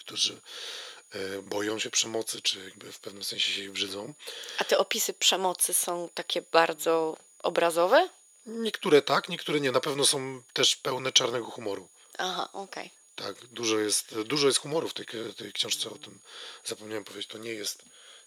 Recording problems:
thin; very; fading below 500 Hz
high-pitched whine; faint; throughout; 6.5 kHz, 30 dB below the speech

